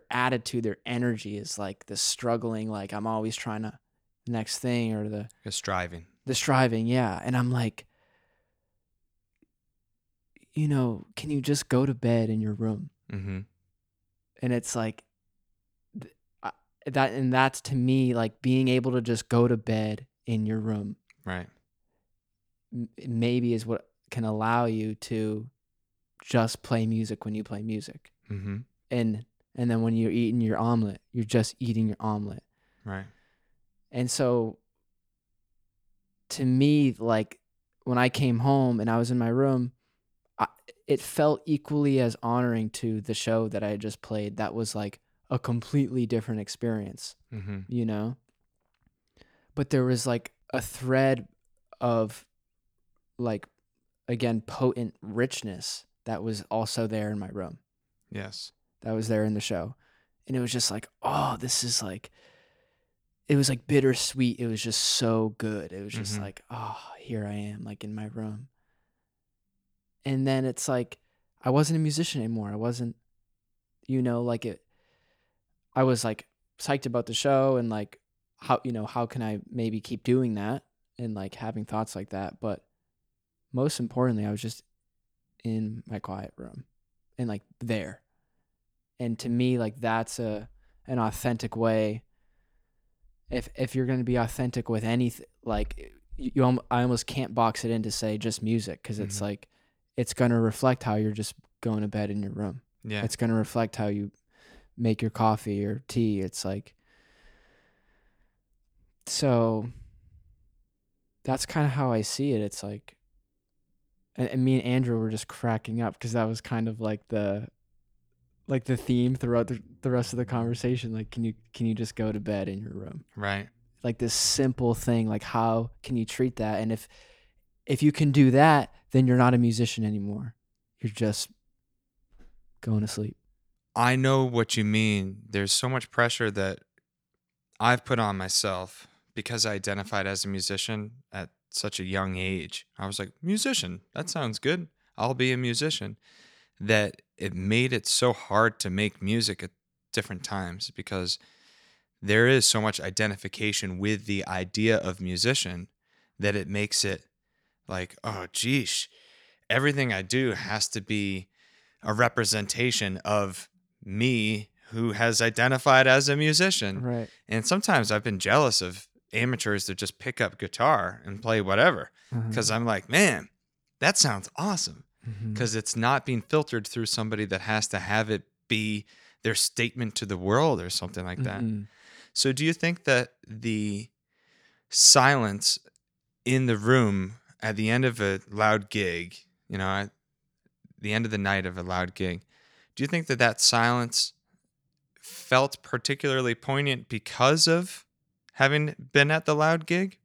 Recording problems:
none

